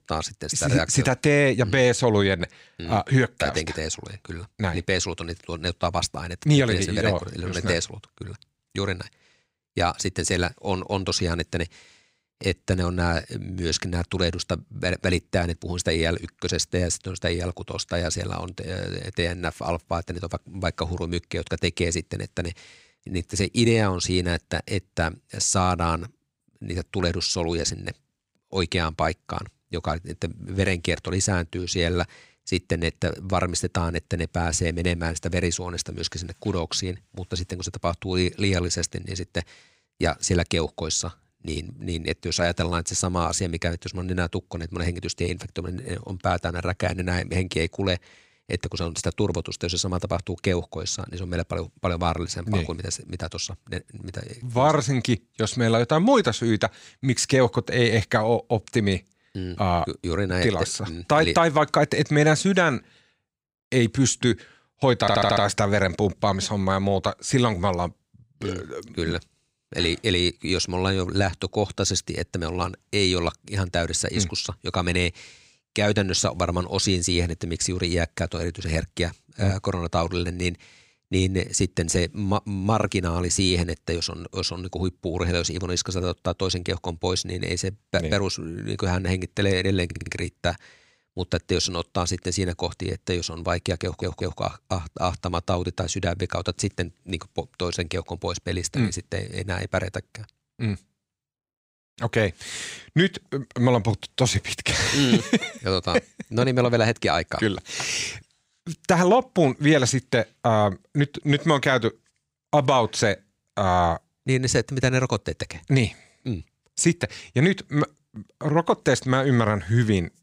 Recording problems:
audio stuttering; at 1:05, at 1:30 and at 1:34

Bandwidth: 15.5 kHz